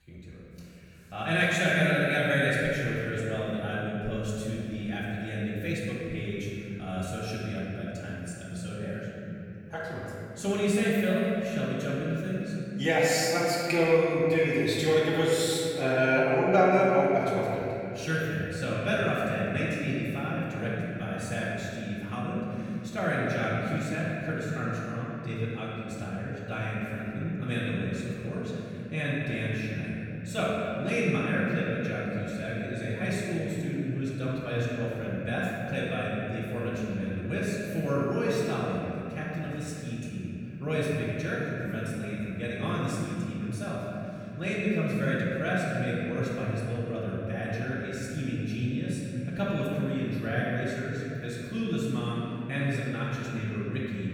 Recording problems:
room echo; strong; dies away in 2.9 s
off-mic speech; far

